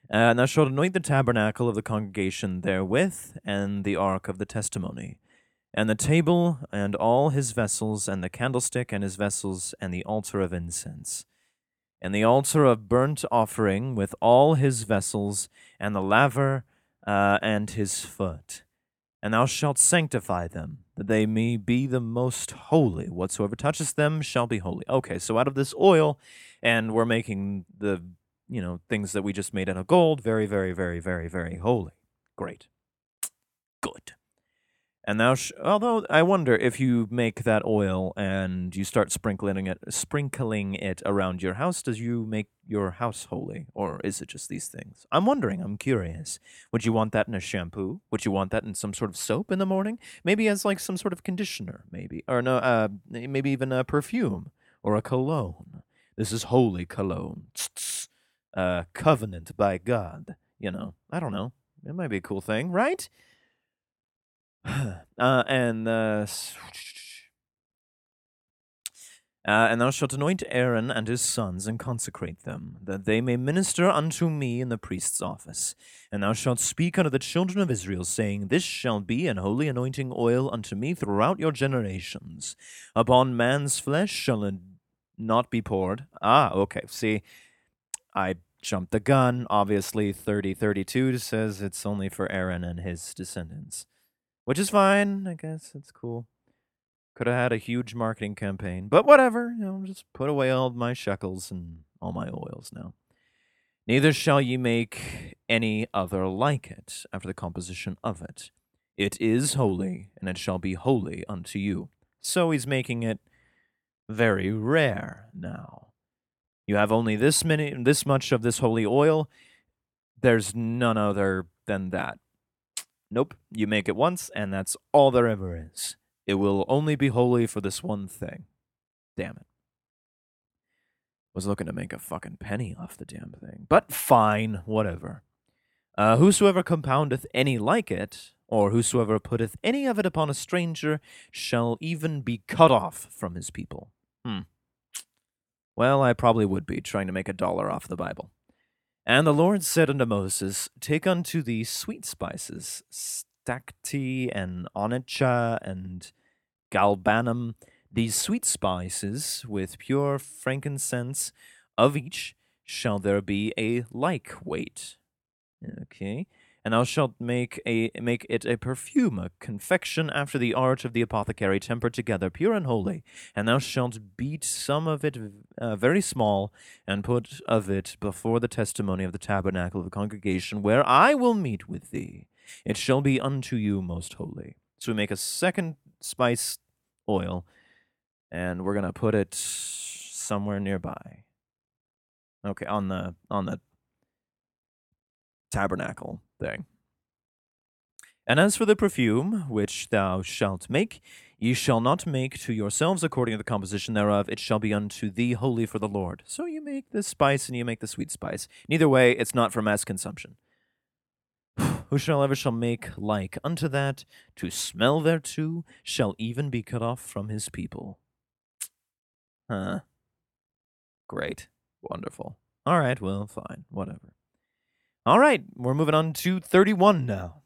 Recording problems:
none

